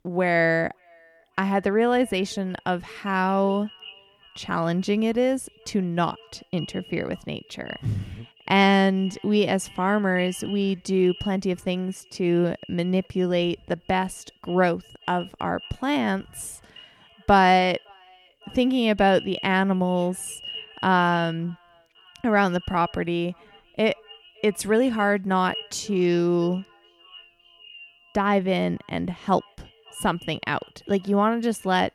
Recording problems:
echo of what is said; faint; throughout; 560 ms later, 20 dB below the speech

